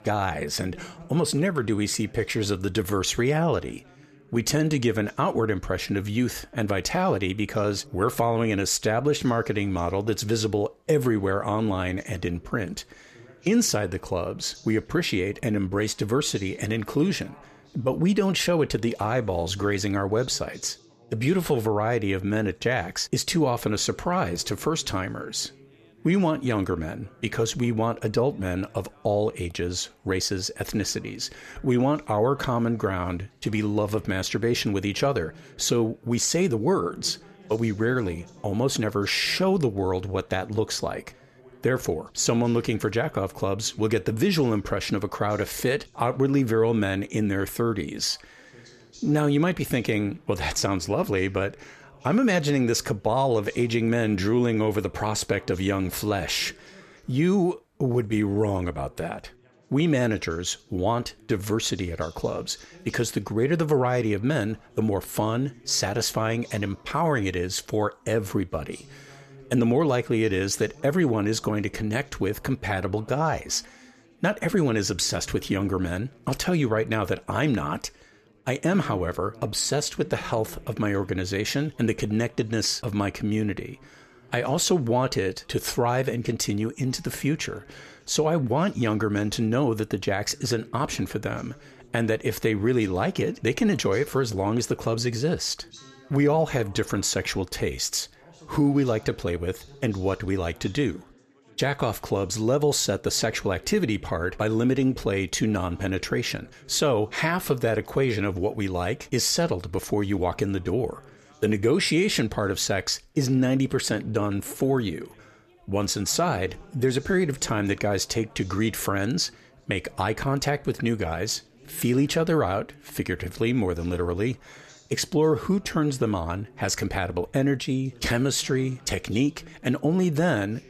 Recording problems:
background chatter; faint; throughout; 3 voices, 25 dB below the speech

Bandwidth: 14 kHz